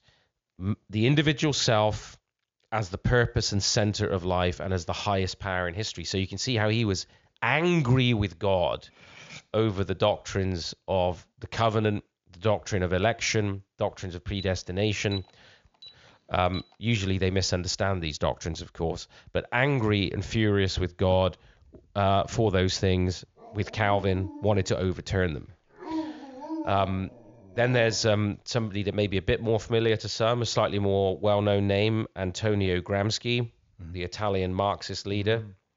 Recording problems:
high frequencies cut off; noticeable; nothing above 7 kHz
clattering dishes; faint; at 9 s; peak 20 dB below the speech
alarm; faint; from 14 to 17 s; peak 15 dB below the speech
dog barking; noticeable; from 23 to 28 s; peak 7 dB below the speech

